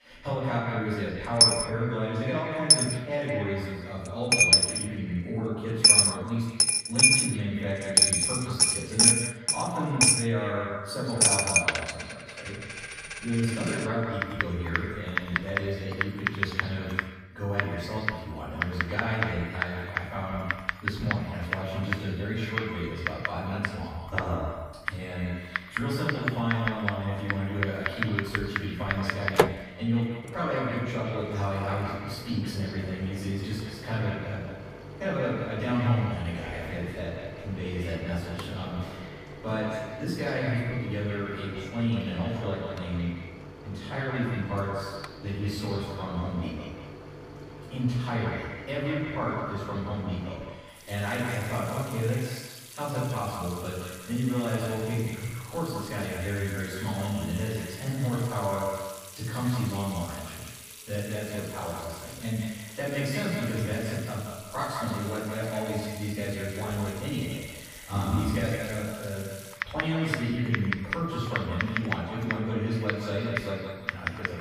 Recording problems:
echo of what is said; strong; throughout; 170 ms later, 8 dB below the speech
off-mic speech; far
room echo; noticeable; dies away in 0.7 s
household noises; very loud; throughout; 6 dB above the speech

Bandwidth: 15 kHz